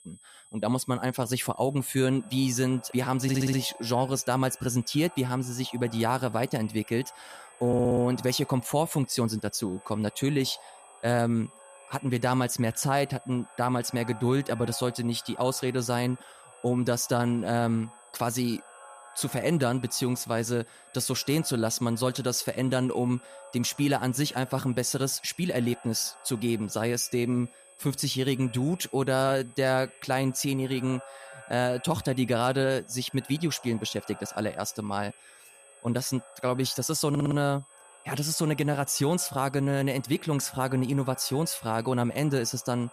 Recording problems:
echo of what is said; faint; throughout; 500 ms later, 25 dB below the speech
high-pitched whine; faint; throughout; 8 kHz, 25 dB below the speech
audio stuttering; at 3 s, at 7.5 s and at 37 s

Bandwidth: 14.5 kHz